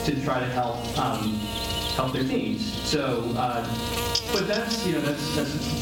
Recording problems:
off-mic speech; far
room echo; noticeable; dies away in 0.5 s
squashed, flat; somewhat
electrical hum; loud; throughout; 60 Hz, 3 dB below the speech

